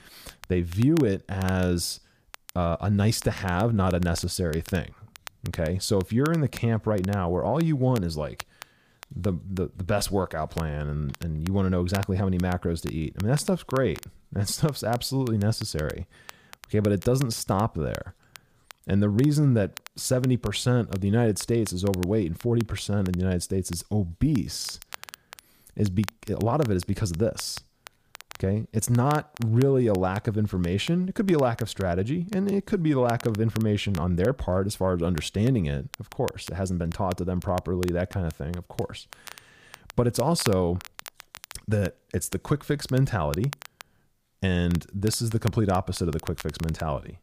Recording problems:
crackle, like an old record; noticeable; 20 dB below the speech

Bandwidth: 15 kHz